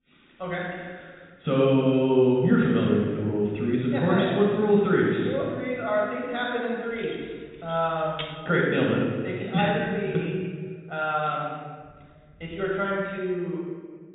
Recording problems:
room echo; strong; dies away in 1.5 s
off-mic speech; far
high frequencies cut off; severe; nothing above 4 kHz
jangling keys; faint; from 7 to 8.5 s; peak 10 dB below the speech

